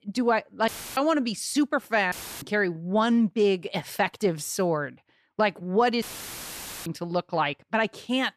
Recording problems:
audio cutting out; filled with static; at 0.5 s, at 2 s and at 6 s for 1 s

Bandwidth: 14 kHz